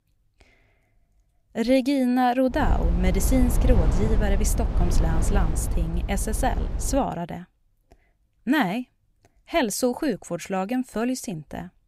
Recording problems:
low rumble; noticeable; from 2.5 to 7 s; 10 dB below the speech

